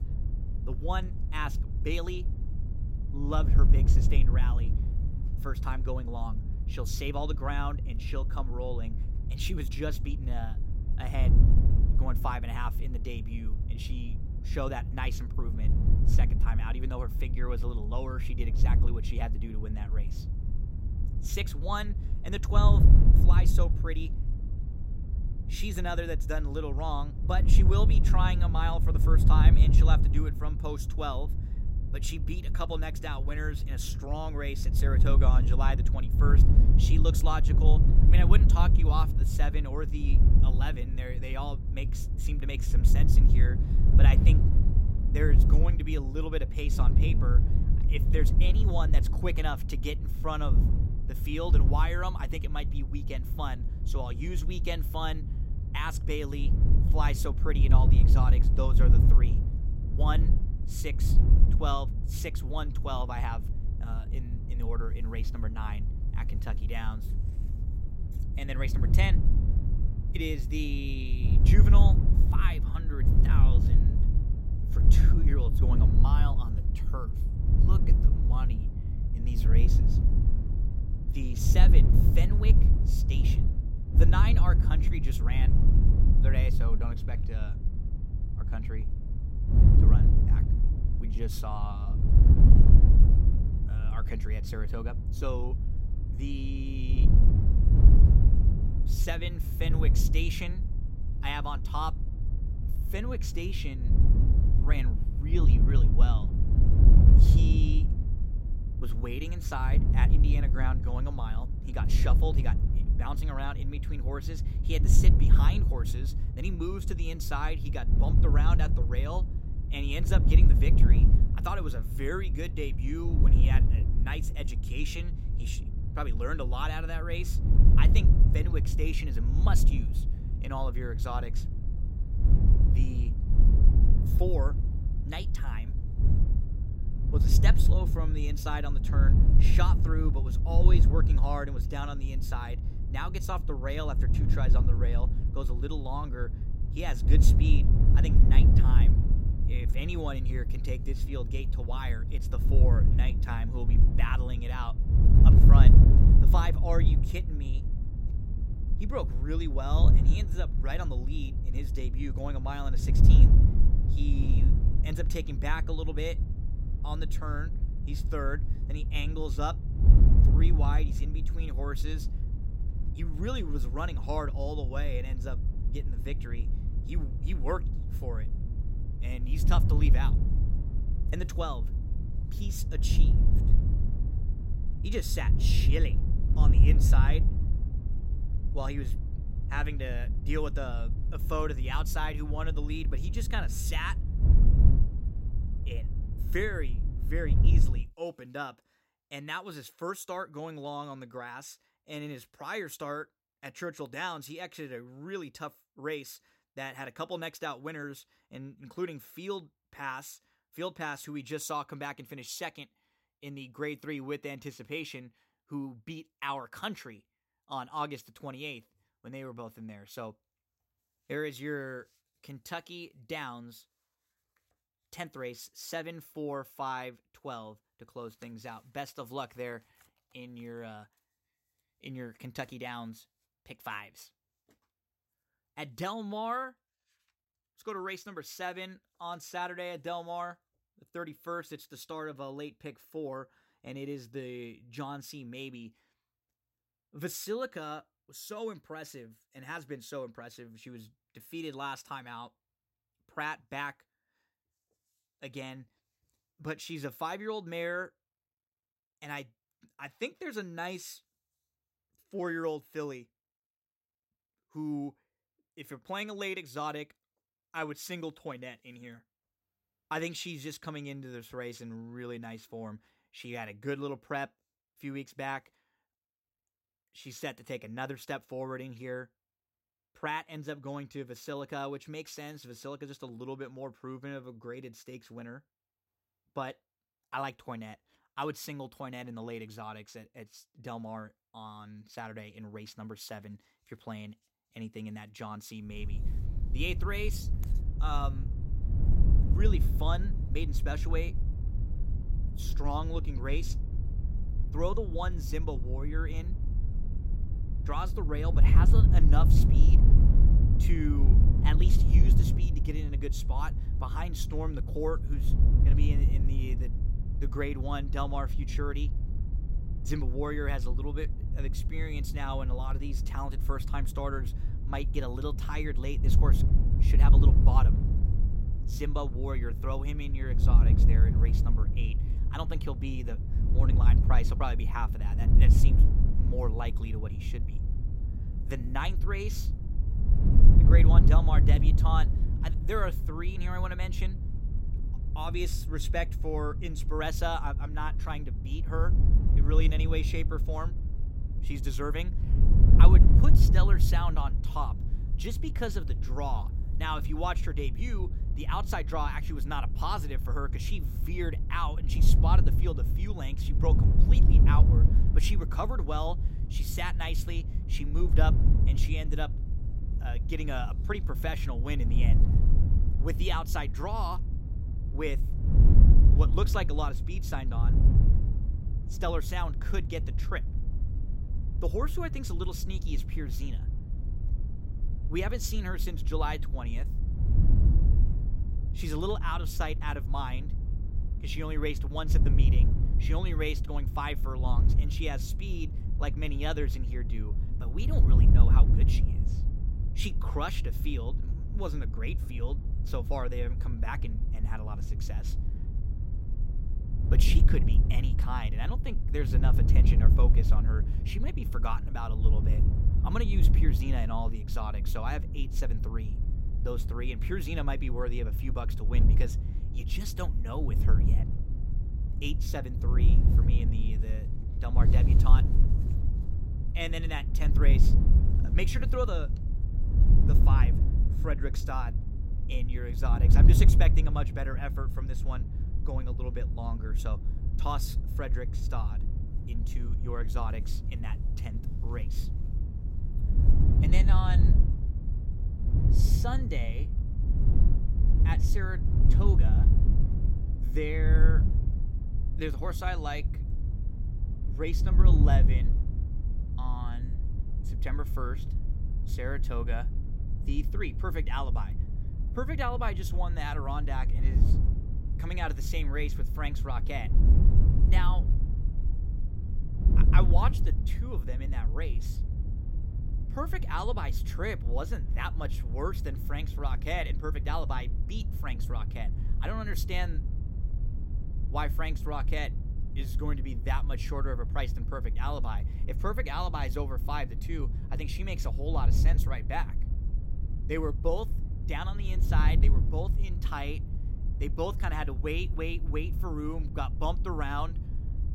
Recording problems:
wind noise on the microphone; heavy; until 3:18 and from 4:56 on; 6 dB below the speech

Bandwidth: 16 kHz